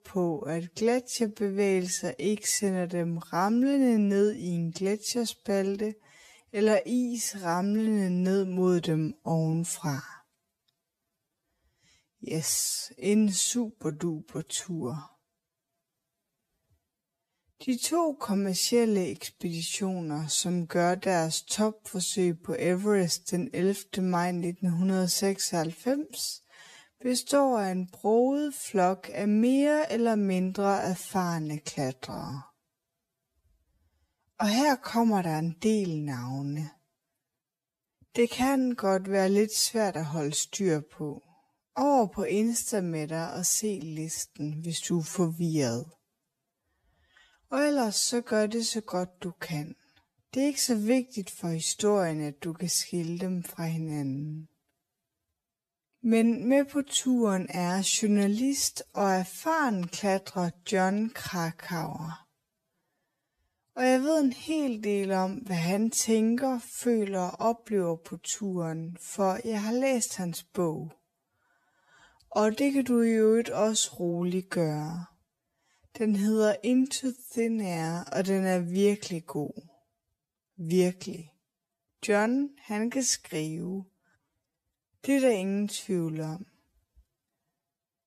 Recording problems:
wrong speed, natural pitch; too slow; 0.5 times normal speed

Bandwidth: 14.5 kHz